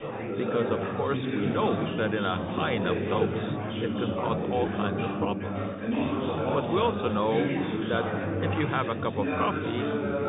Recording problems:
high frequencies cut off; severe; nothing above 3.5 kHz
chatter from many people; very loud; throughout; 1 dB above the speech

